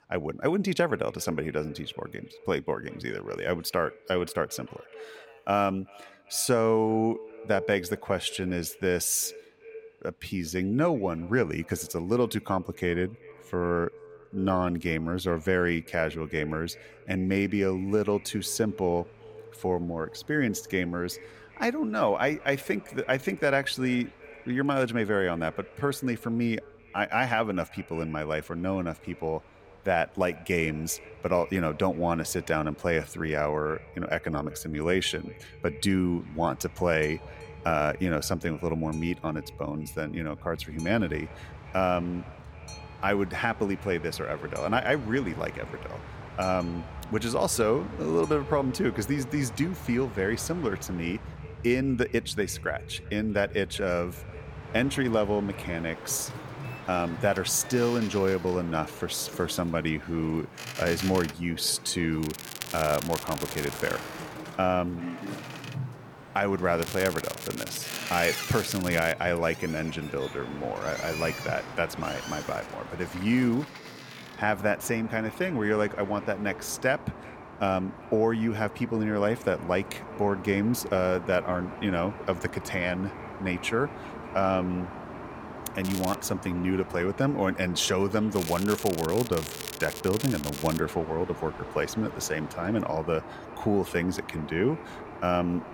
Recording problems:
echo of what is said; faint; throughout; 390 ms later, 20 dB below the speech
crackling; loud; 4 times, first at 1:02; 9 dB below the speech
train or aircraft noise; noticeable; throughout; 15 dB below the speech

